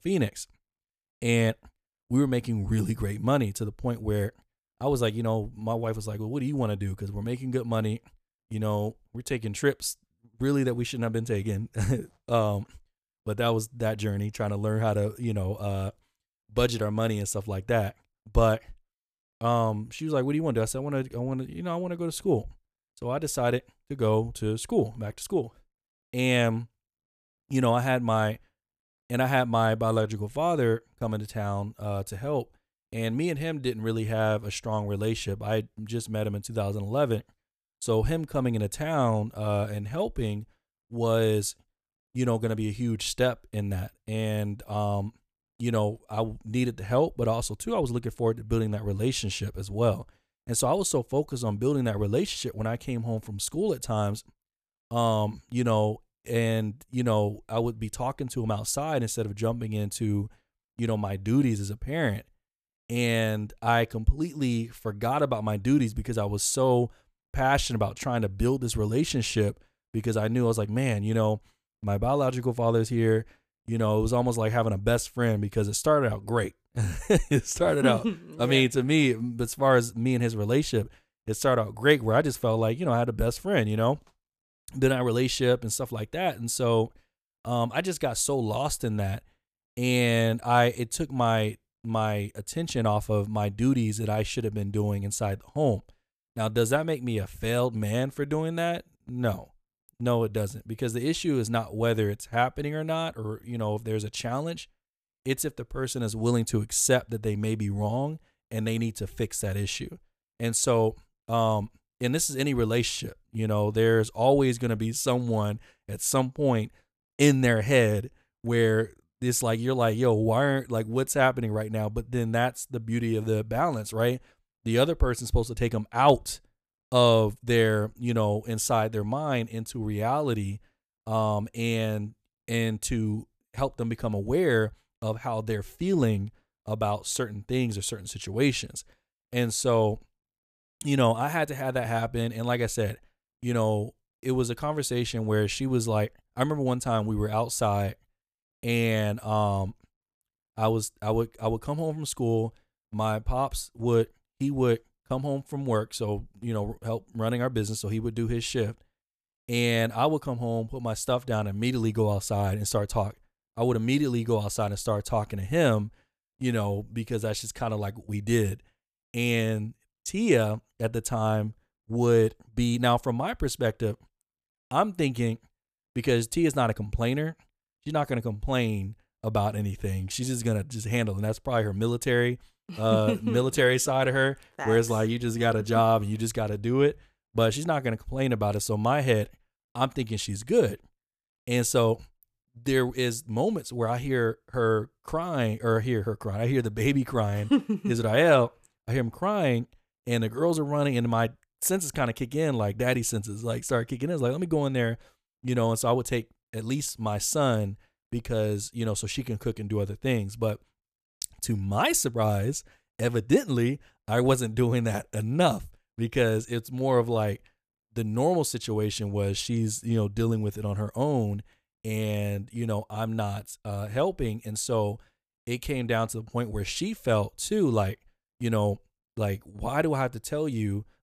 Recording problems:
none

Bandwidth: 14.5 kHz